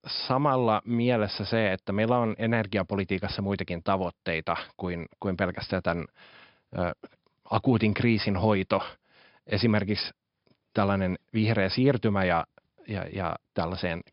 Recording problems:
high frequencies cut off; noticeable; nothing above 5.5 kHz

